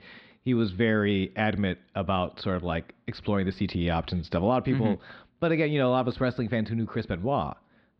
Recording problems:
muffled; very slightly; fading above 4 kHz

